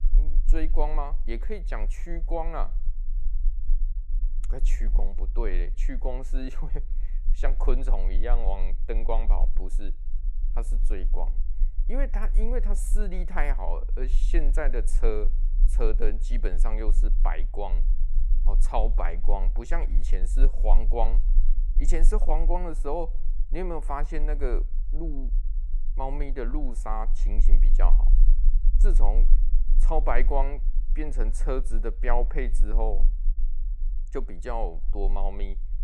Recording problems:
low rumble; faint; throughout; 20 dB below the speech

